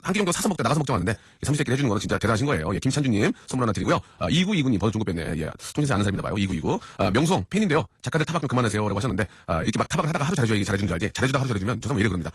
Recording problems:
wrong speed, natural pitch; too fast; 1.7 times normal speed
garbled, watery; slightly; nothing above 11 kHz

